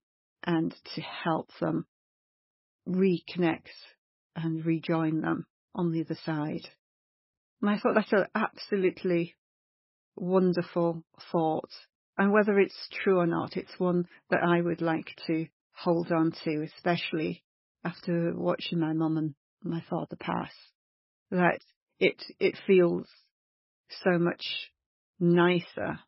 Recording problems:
garbled, watery; badly; nothing above 5.5 kHz

